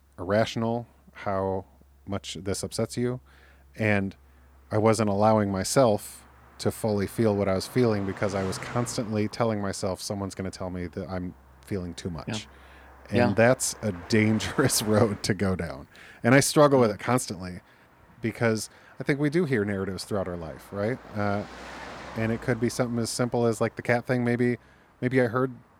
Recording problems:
traffic noise; faint; throughout; 20 dB below the speech

